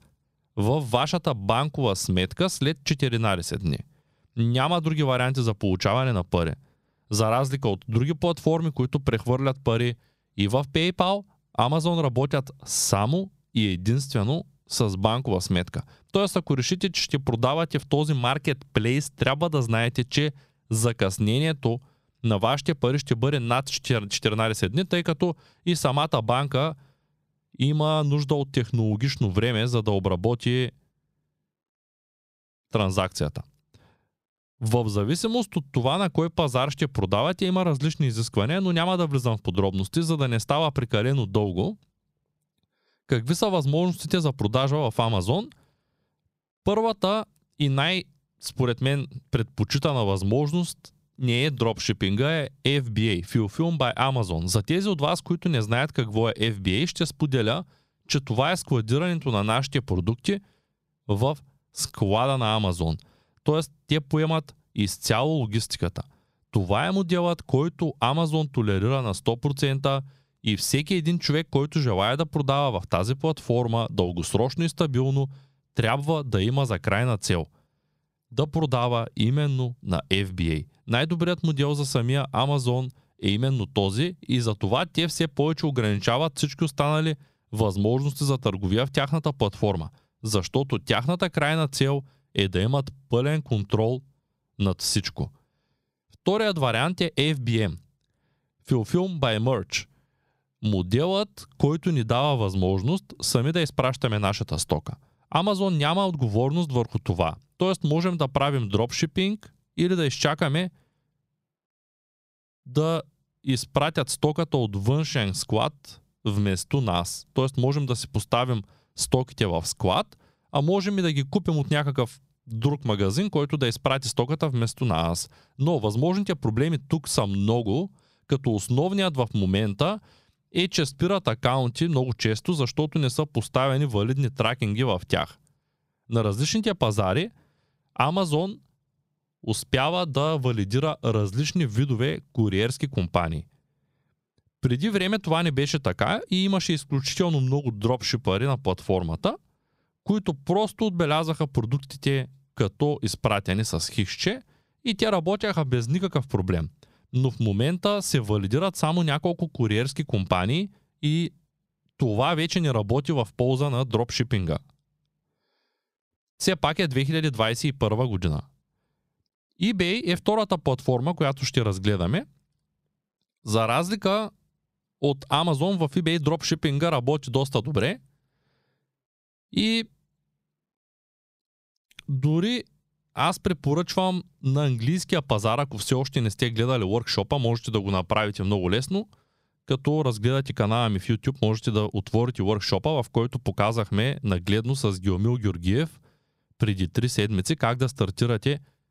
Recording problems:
squashed, flat; somewhat

